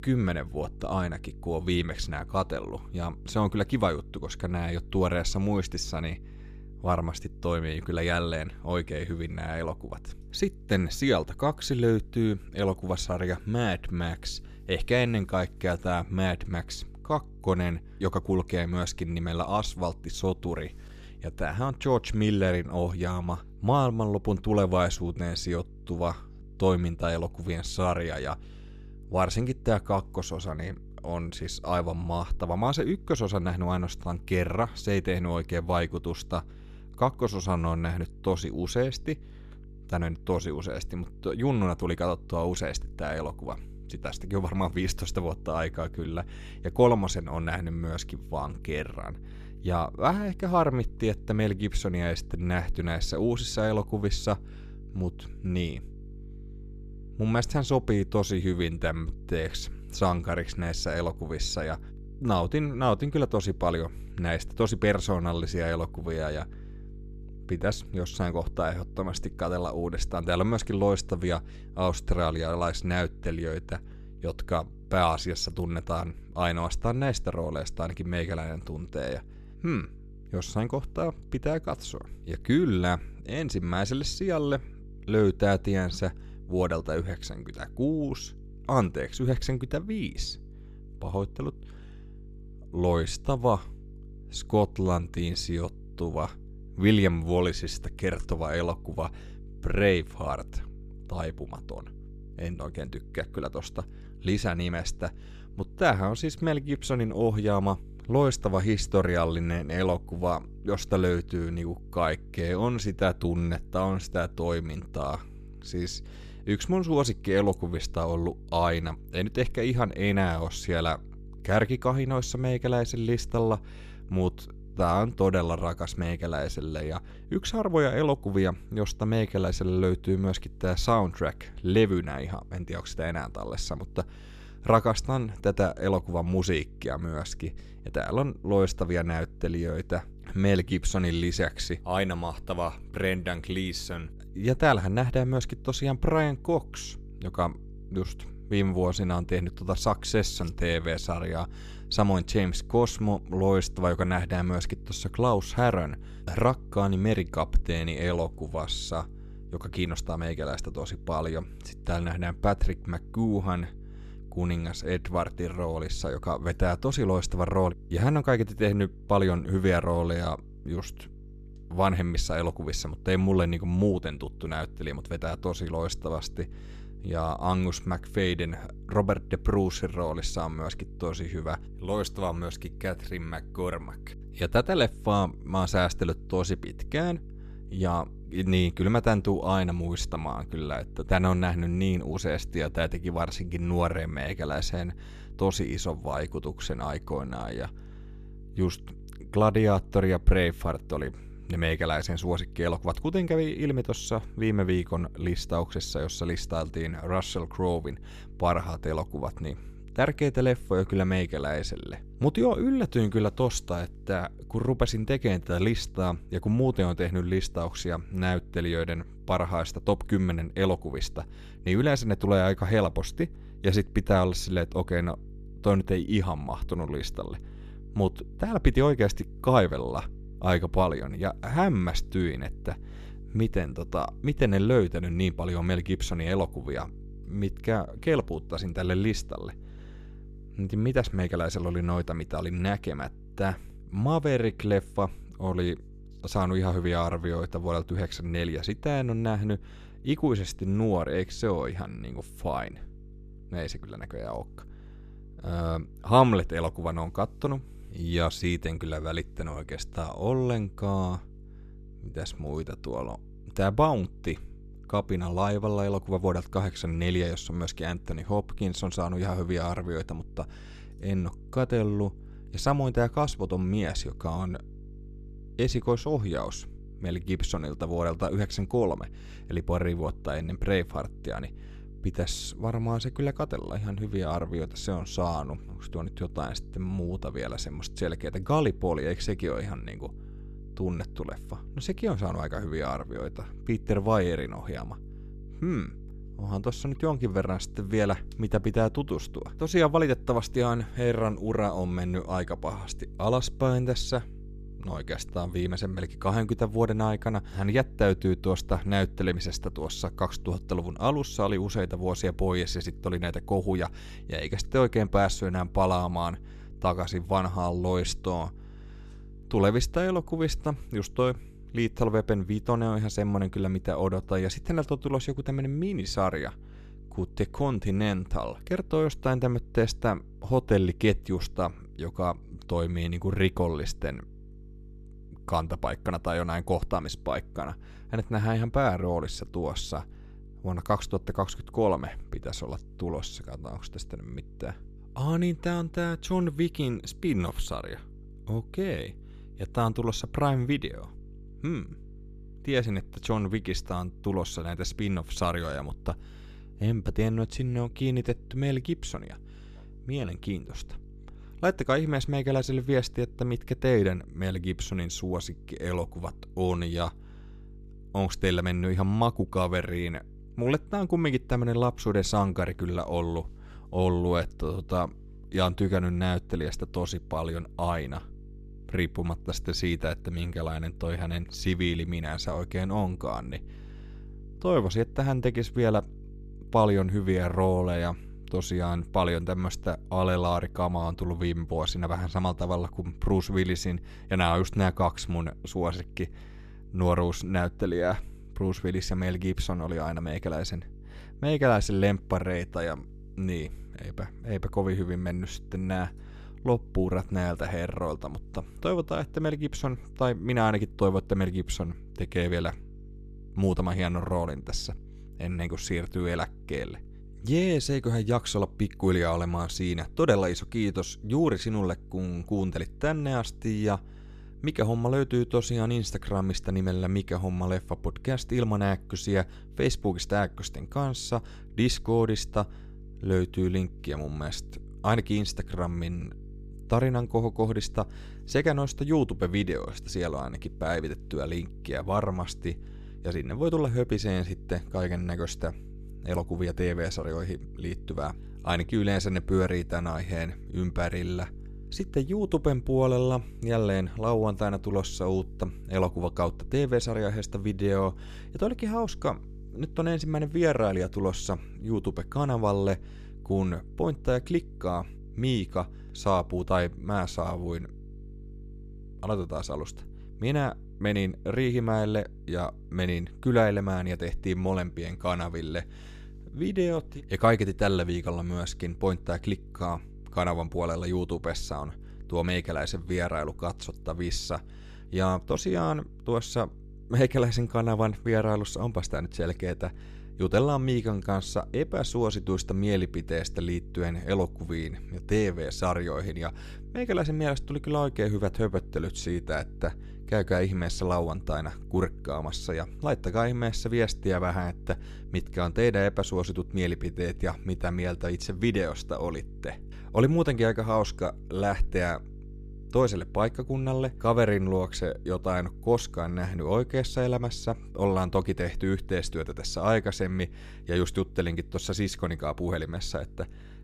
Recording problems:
electrical hum; faint; throughout; 50 Hz, 25 dB below the speech

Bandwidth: 14.5 kHz